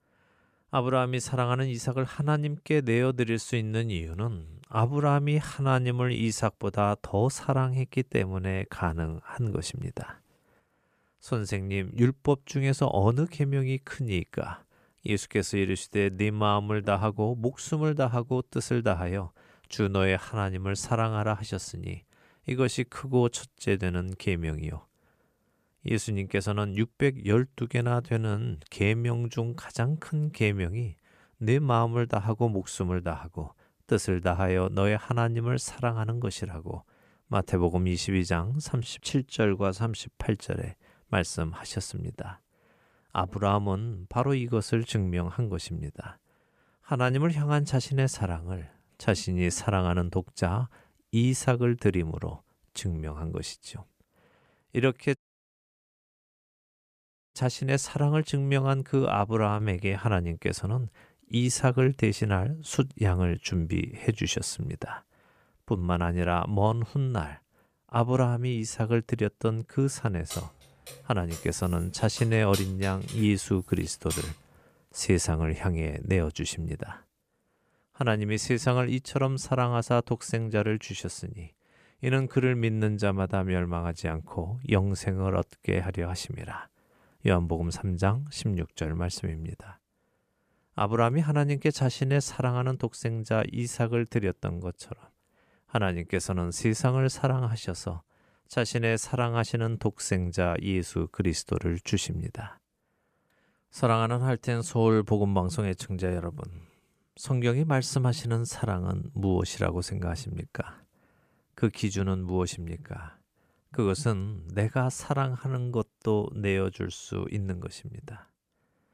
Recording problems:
audio cutting out; at 55 s for 2 s
jangling keys; noticeable; from 1:10 to 1:14; peak 7 dB below the speech

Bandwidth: 14.5 kHz